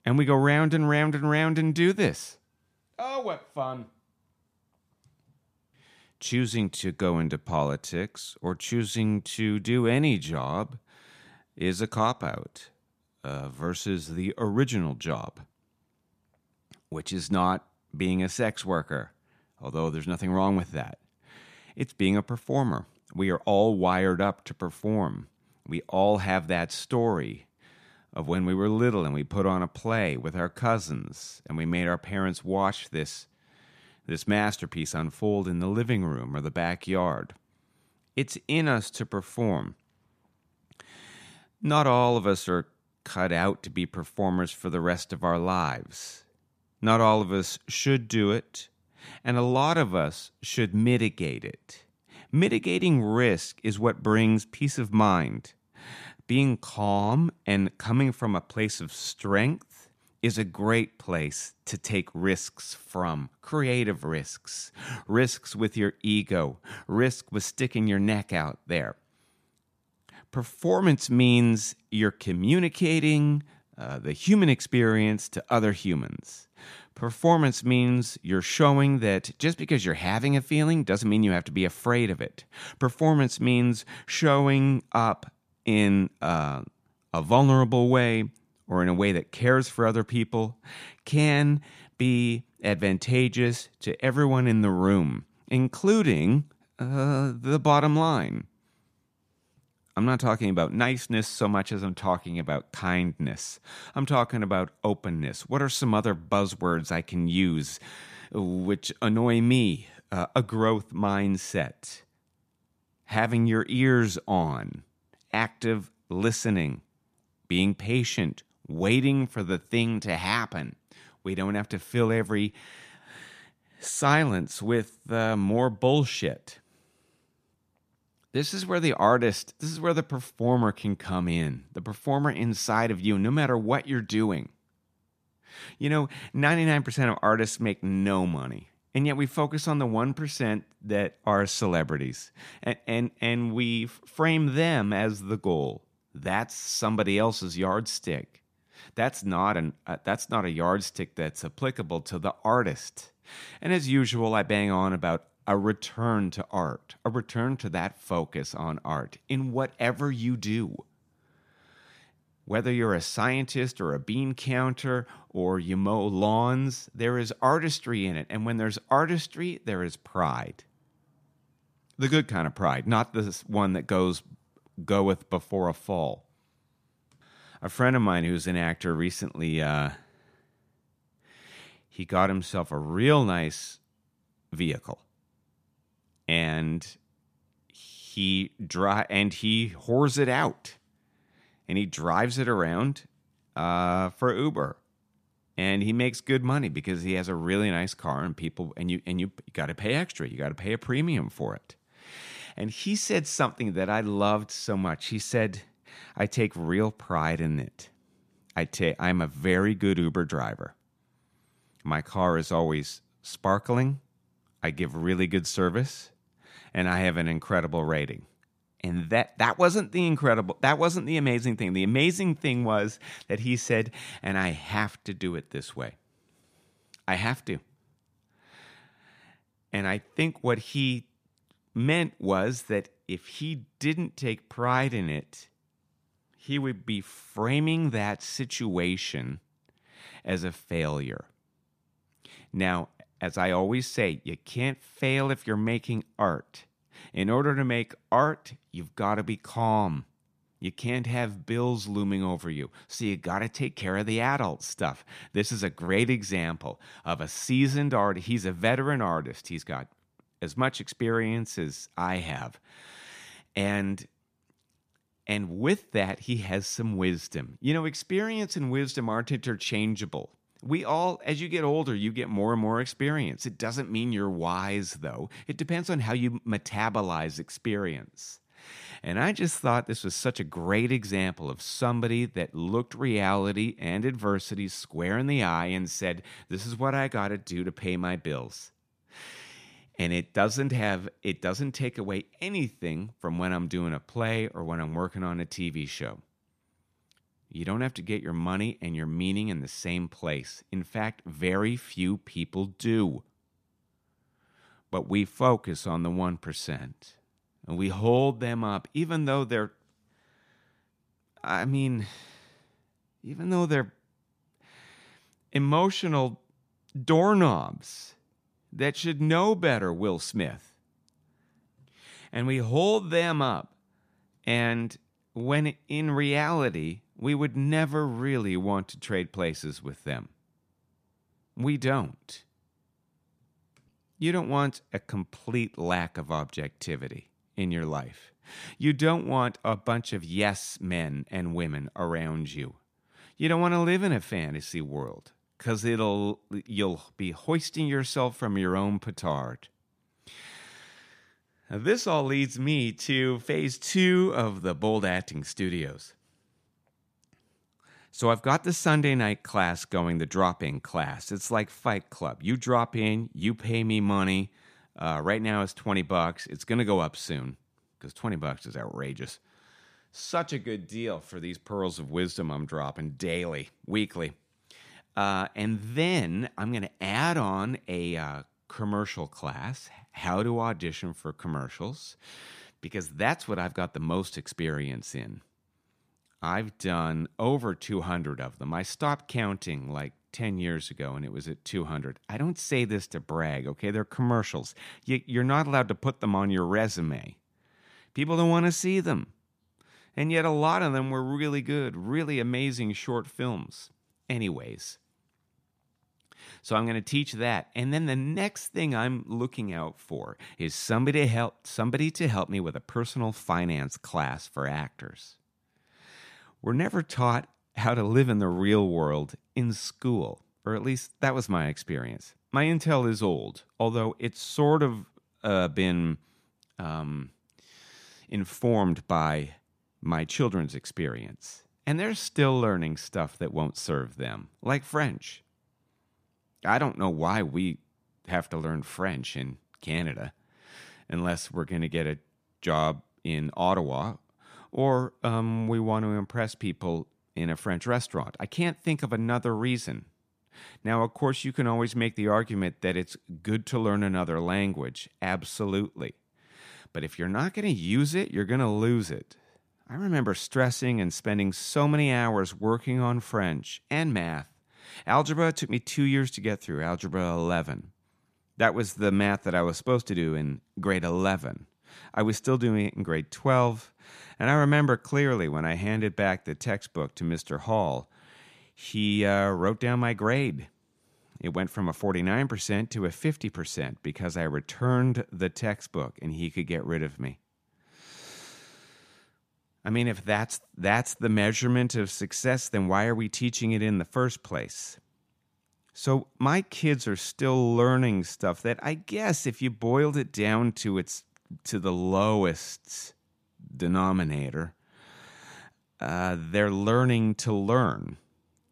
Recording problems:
none

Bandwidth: 14.5 kHz